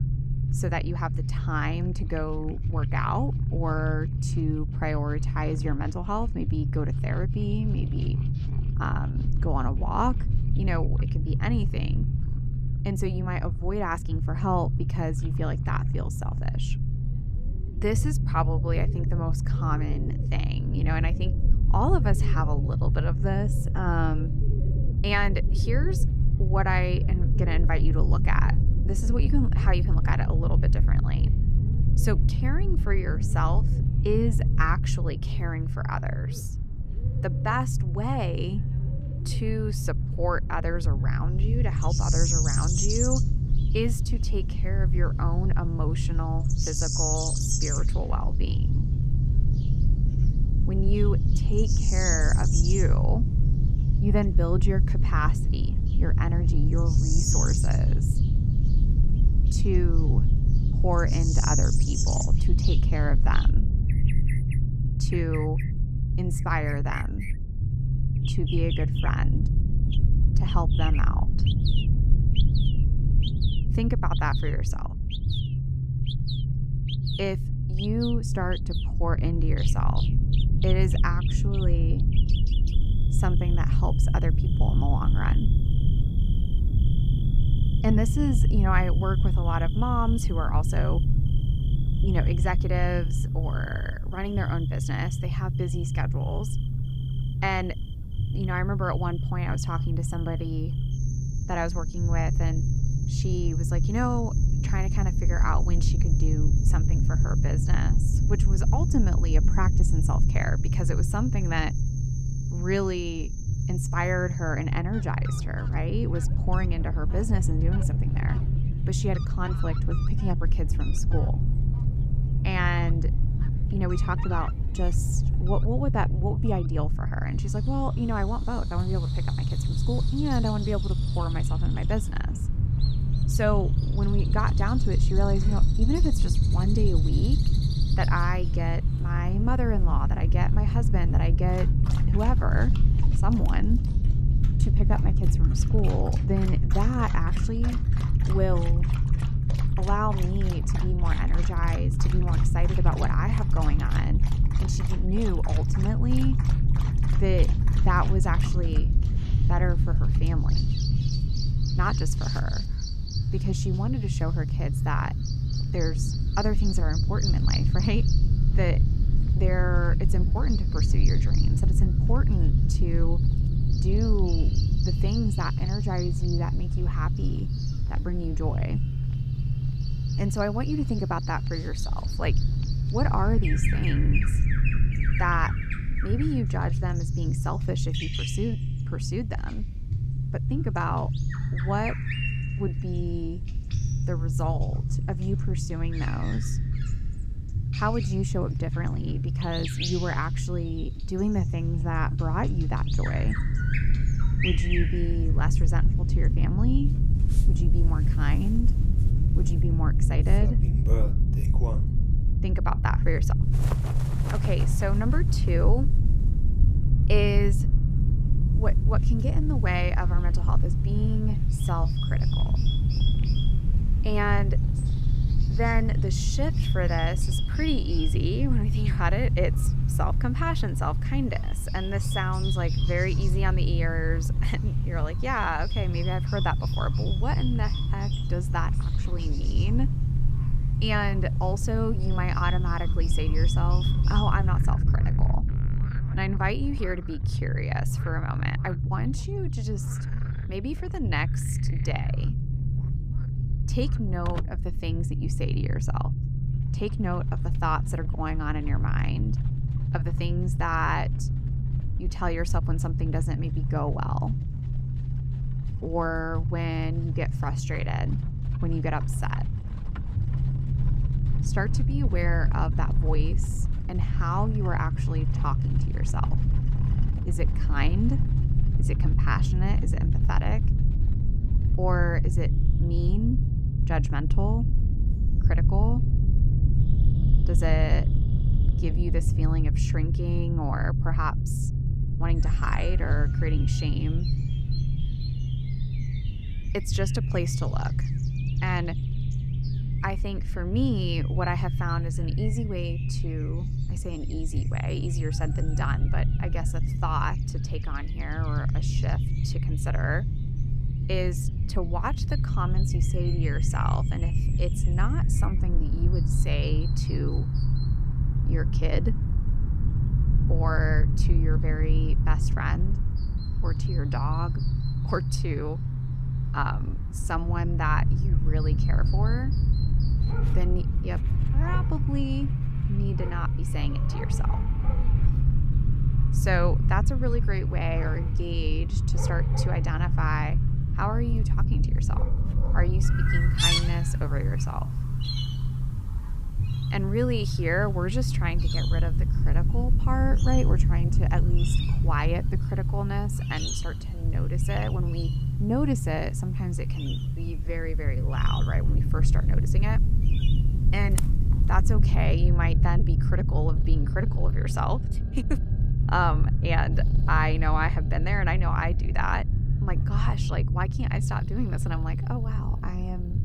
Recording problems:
animal sounds; loud; throughout; 8 dB below the speech
low rumble; loud; throughout; 7 dB below the speech

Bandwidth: 15.5 kHz